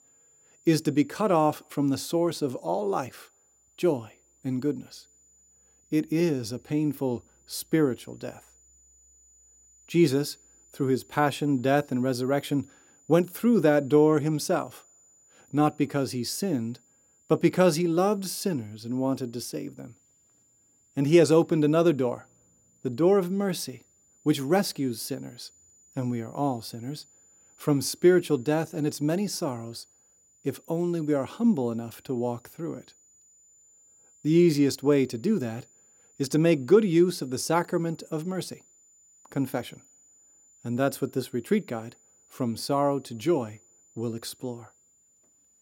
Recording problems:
high-pitched whine; faint; throughout; 7 kHz, 30 dB below the speech

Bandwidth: 16.5 kHz